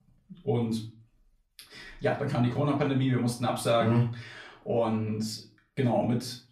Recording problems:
off-mic speech; far
room echo; slight; dies away in 0.3 s

